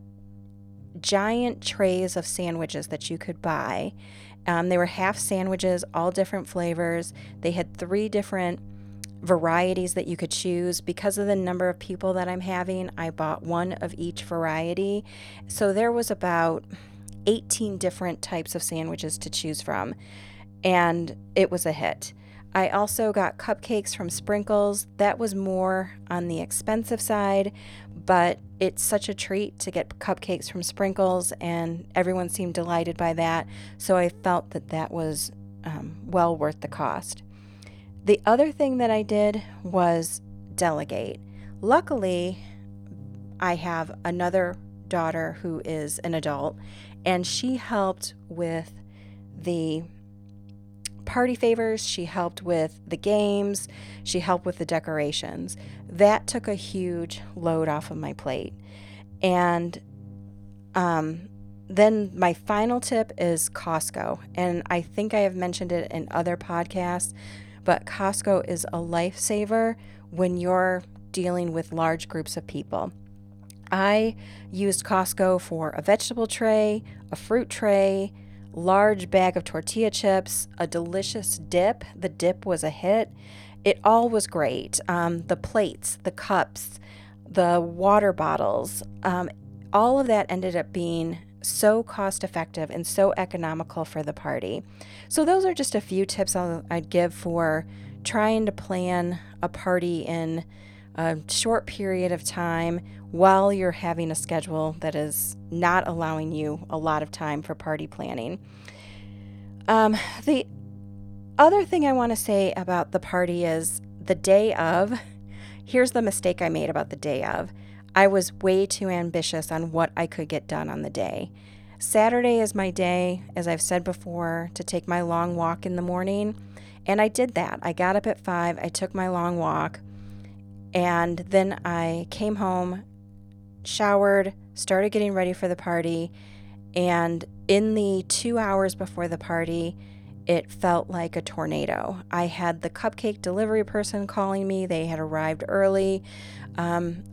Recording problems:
electrical hum; faint; throughout; 50 Hz, 30 dB below the speech

